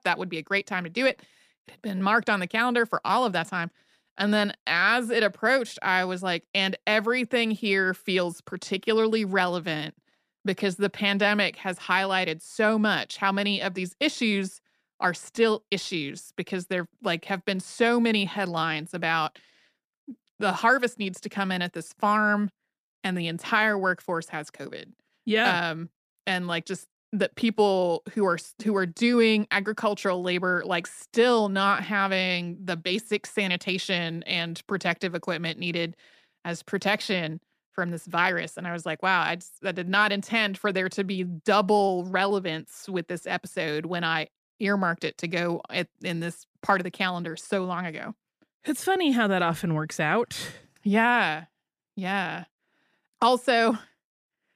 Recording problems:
none

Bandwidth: 14.5 kHz